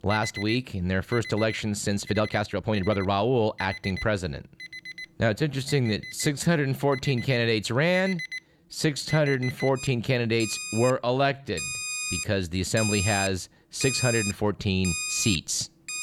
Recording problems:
alarms or sirens; loud; throughout; 7 dB below the speech
uneven, jittery; strongly; from 2 to 12 s

